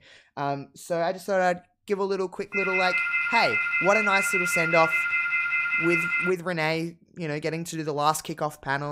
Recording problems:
phone ringing; loud; from 2.5 to 6.5 s; peak 4 dB above the speech
abrupt cut into speech; at the end

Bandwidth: 15.5 kHz